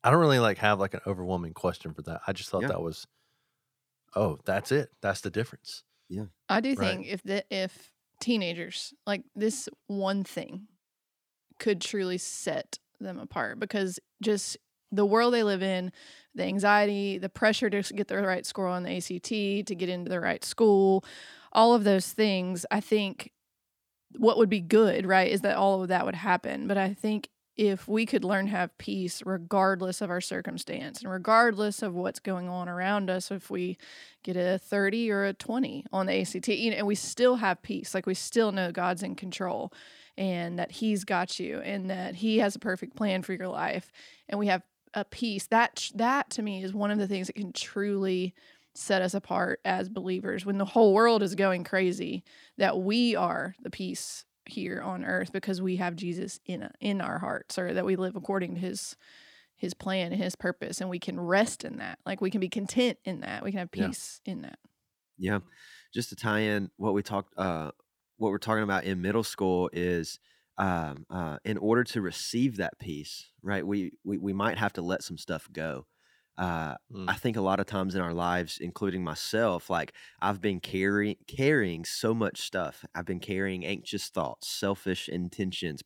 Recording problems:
none

